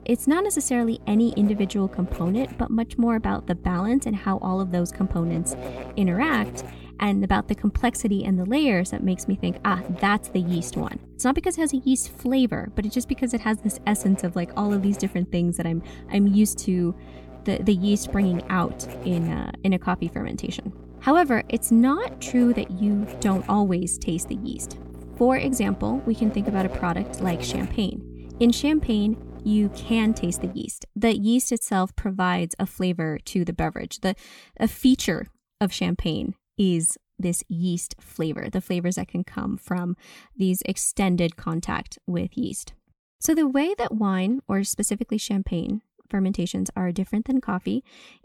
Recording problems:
electrical hum; noticeable; until 30 s; 60 Hz, 15 dB below the speech

